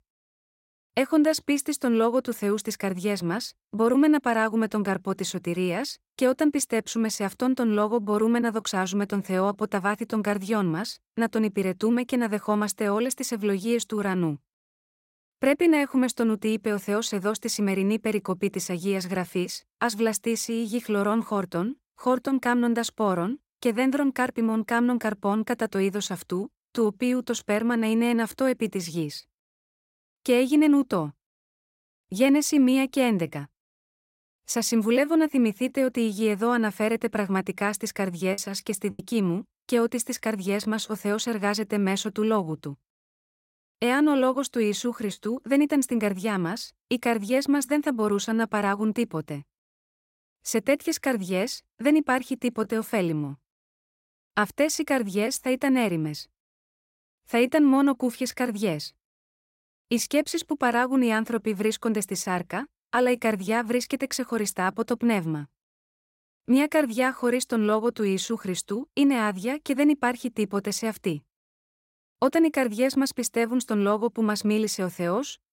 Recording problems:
choppy; very; at 38 s and at 45 s; 7% of the speech affected

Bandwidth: 16 kHz